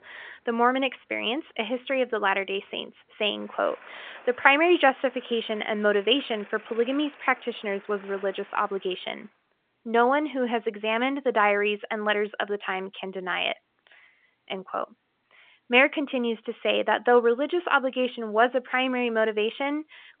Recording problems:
phone-call audio; nothing above 3.5 kHz
traffic noise; faint; until 9 s; 25 dB below the speech

